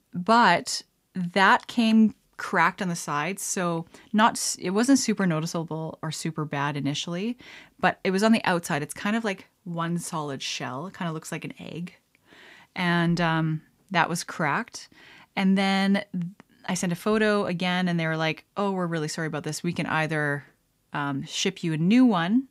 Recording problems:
none

